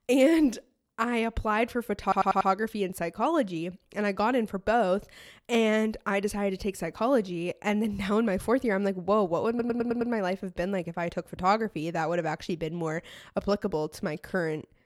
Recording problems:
audio stuttering; at 2 s and at 9.5 s

